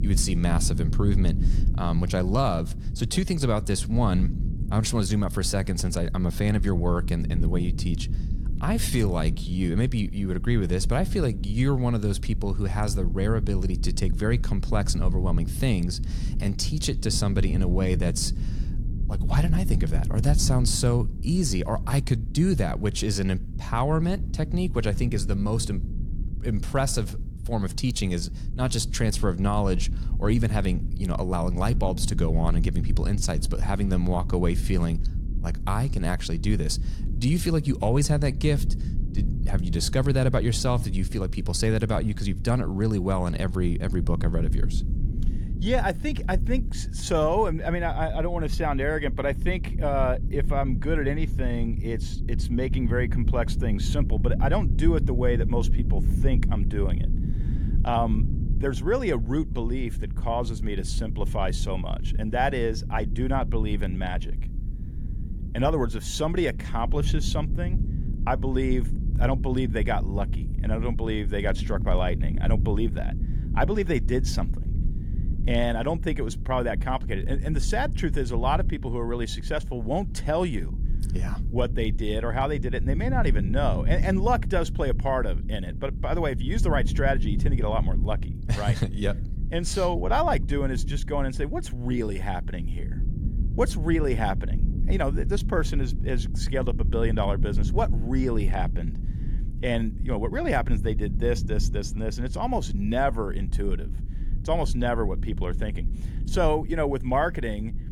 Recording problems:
low rumble; noticeable; throughout; 15 dB below the speech

